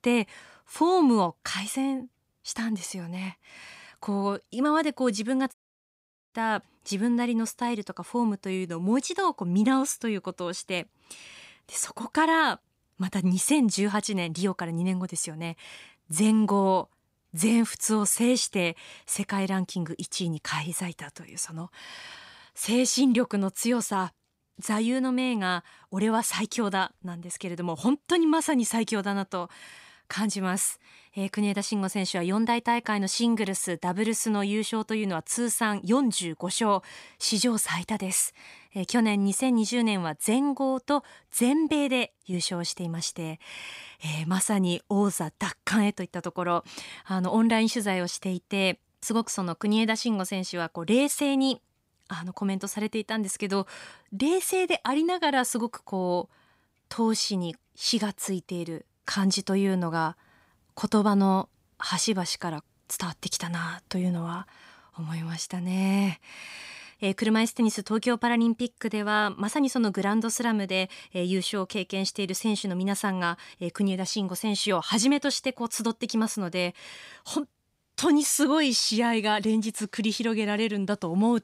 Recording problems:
audio cutting out; at 5.5 s for 1 s

